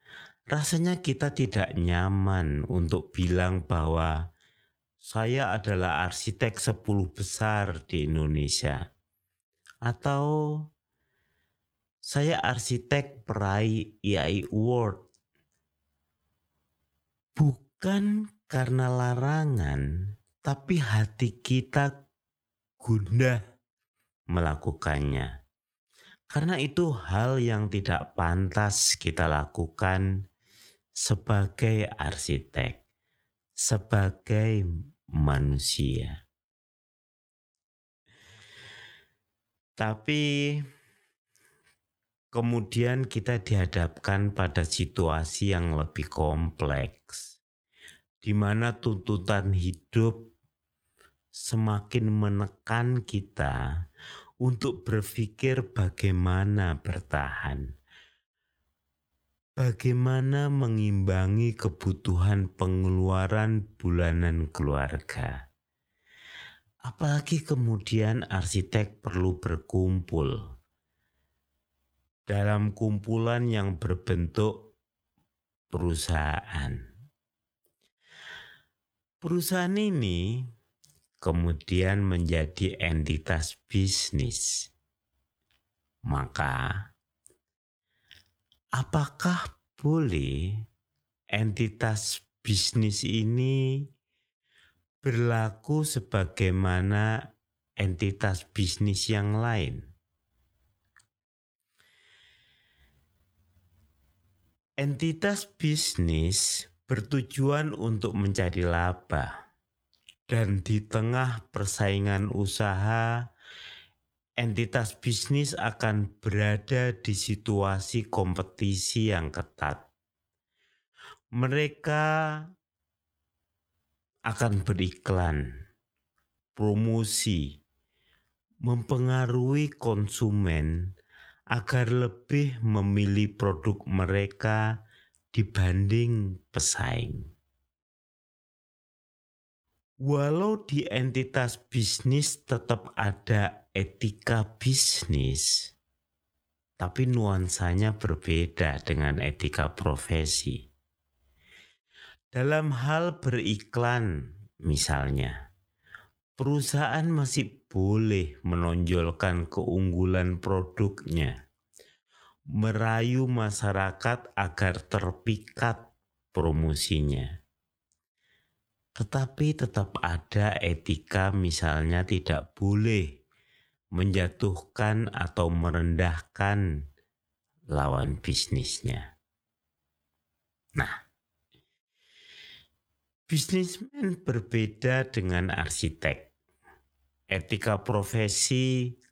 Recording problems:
wrong speed, natural pitch; too slow; 0.6 times normal speed

